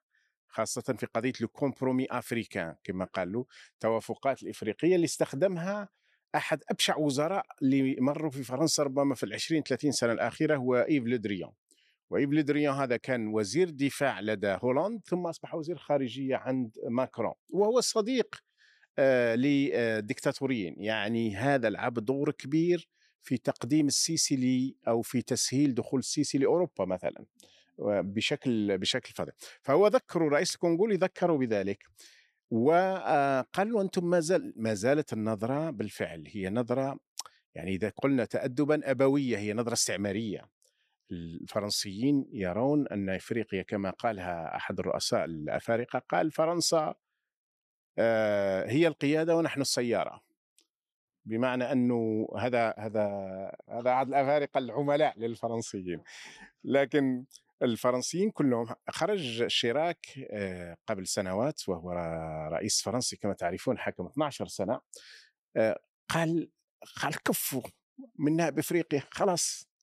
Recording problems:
none

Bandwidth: 14 kHz